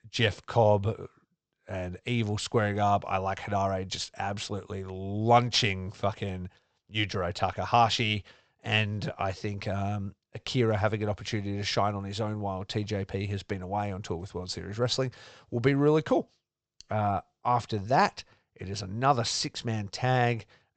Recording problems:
high frequencies cut off; noticeable; nothing above 8 kHz

